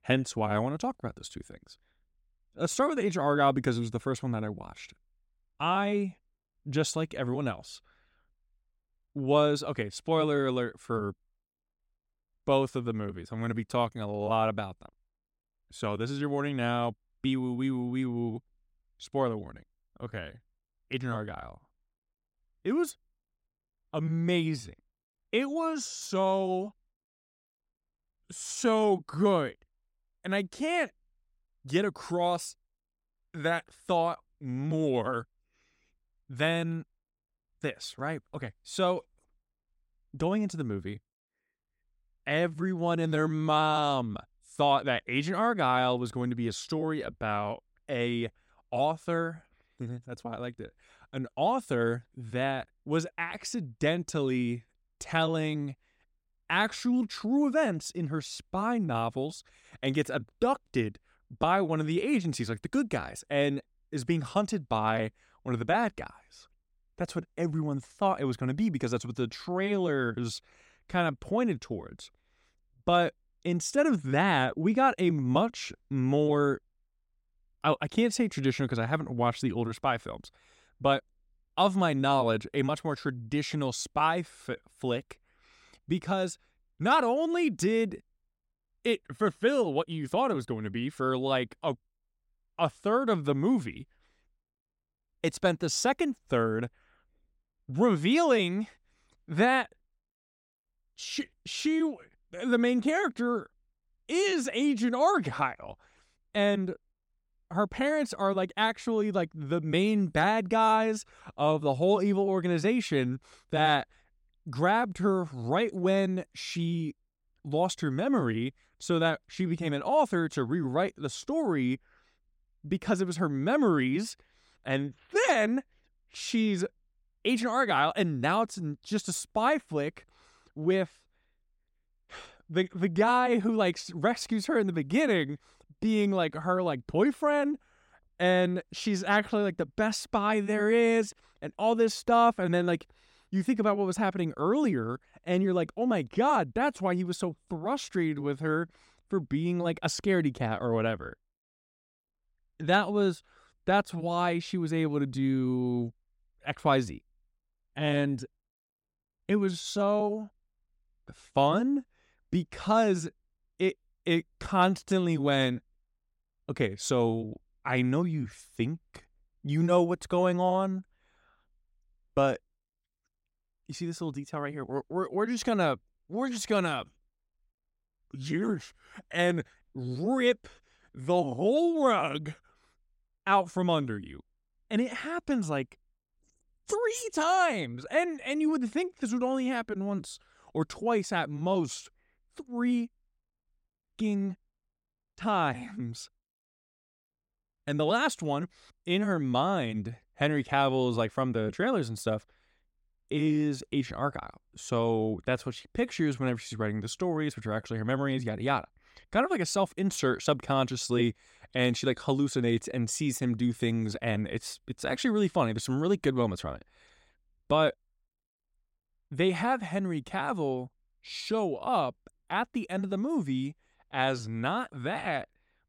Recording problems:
uneven, jittery; slightly; from 13 s to 3:32

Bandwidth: 16 kHz